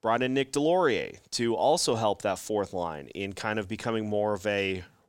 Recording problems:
none

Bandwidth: 16 kHz